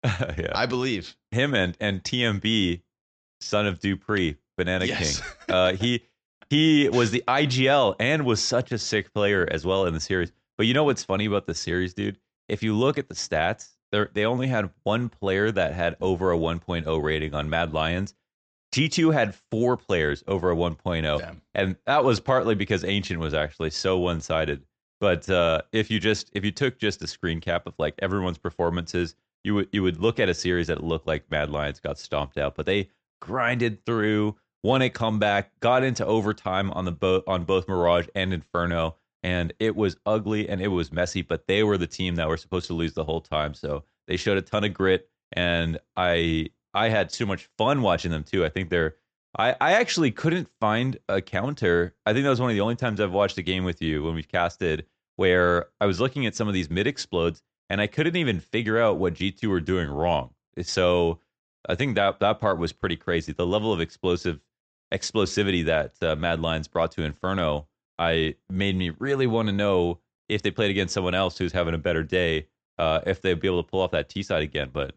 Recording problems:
high frequencies cut off; noticeable; nothing above 8 kHz

